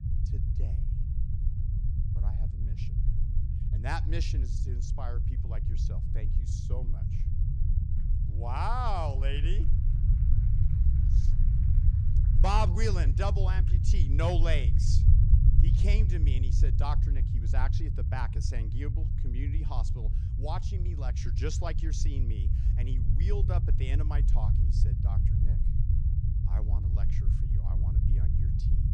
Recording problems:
low rumble; loud; throughout; 7 dB below the speech

